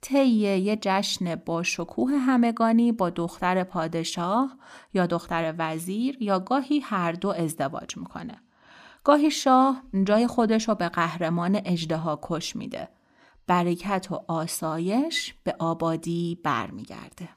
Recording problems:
none

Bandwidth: 14.5 kHz